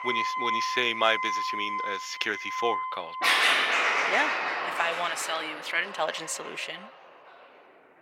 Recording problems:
thin; very; fading below 650 Hz
background music; very loud; throughout; 3 dB above the speech

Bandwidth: 16.5 kHz